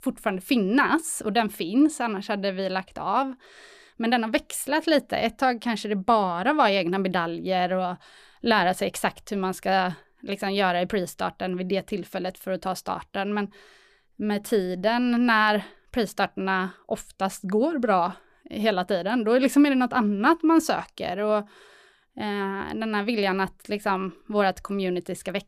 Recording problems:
none

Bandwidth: 14.5 kHz